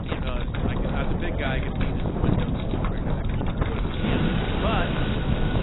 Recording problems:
garbled, watery; badly; nothing above 4 kHz
rain or running water; very loud; throughout; 1 dB above the speech
wind noise on the microphone; heavy; 1 dB above the speech

